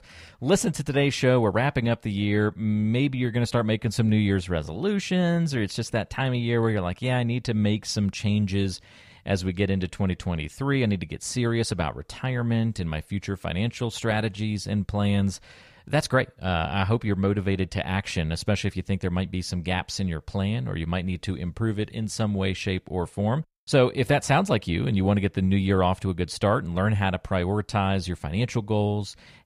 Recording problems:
none

